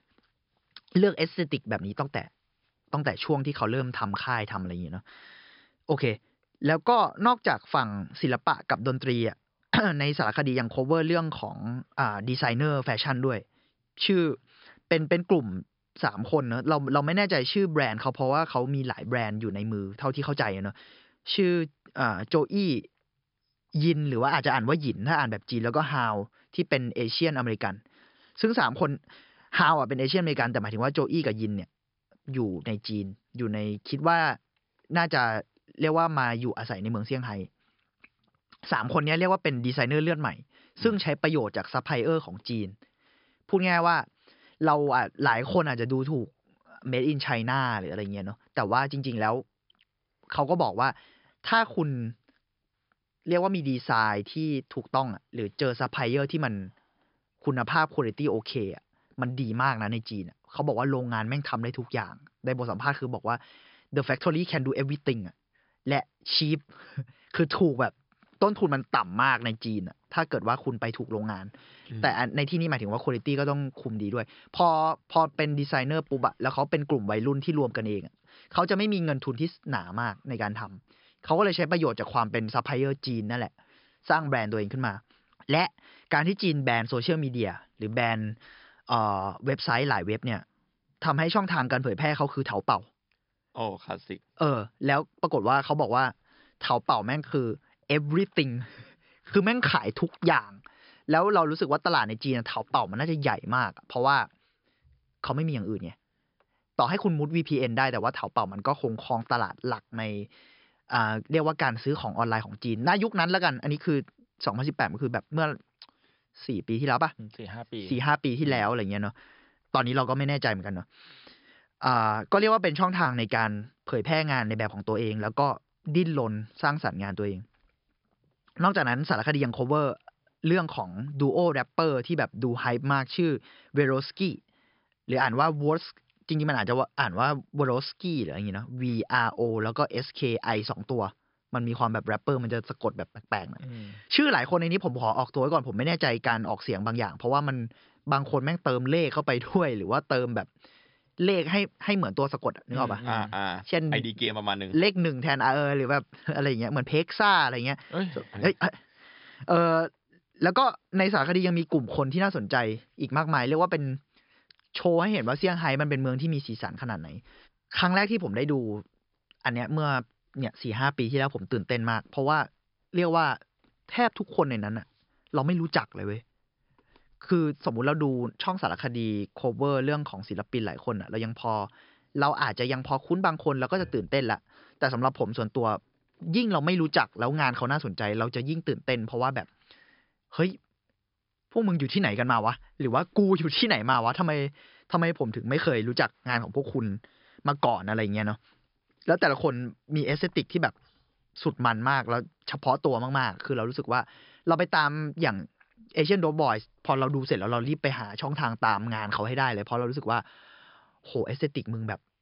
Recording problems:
high frequencies cut off; noticeable; nothing above 5.5 kHz

